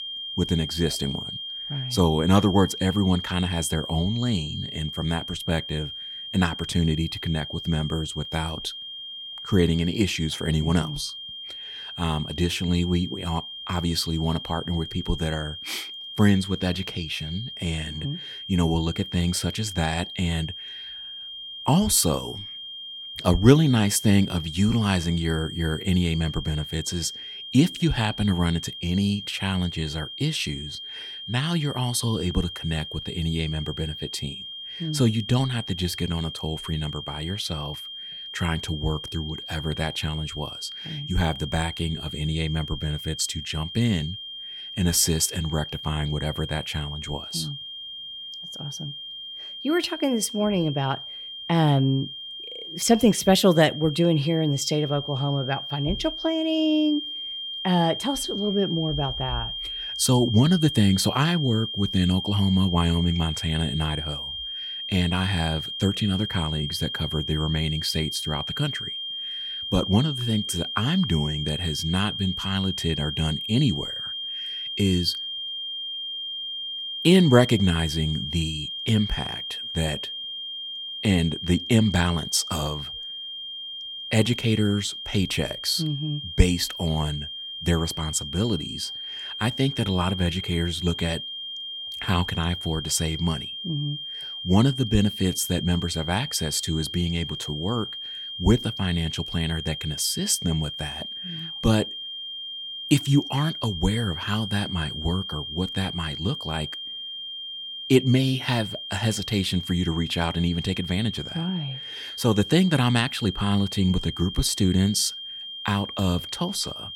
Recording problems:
high-pitched whine; loud; throughout; 3 kHz, 7 dB below the speech

